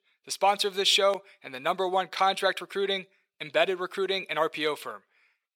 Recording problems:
thin; very; fading below 550 Hz

